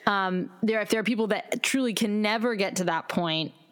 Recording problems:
squashed, flat; somewhat

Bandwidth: 18 kHz